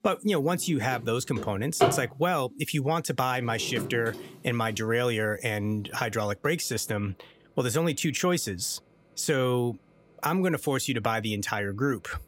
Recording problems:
household noises; loud; throughout; 5 dB below the speech

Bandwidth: 16 kHz